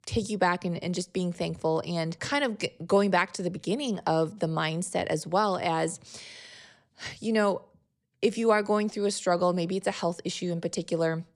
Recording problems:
none

